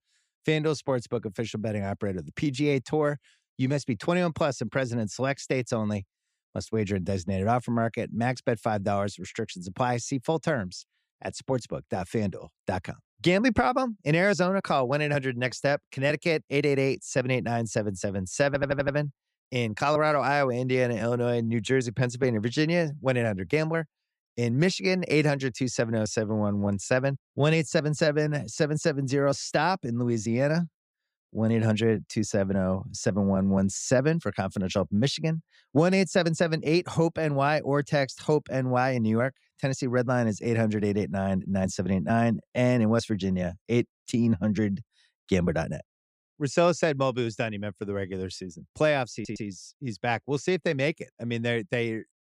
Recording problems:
audio stuttering; at 18 s and at 49 s

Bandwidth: 15 kHz